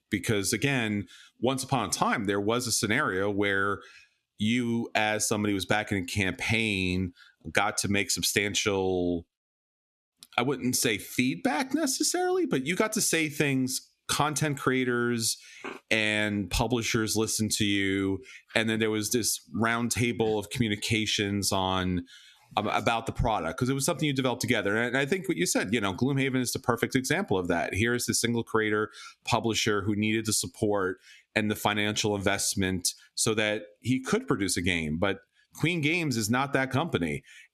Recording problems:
squashed, flat; somewhat

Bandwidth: 13.5 kHz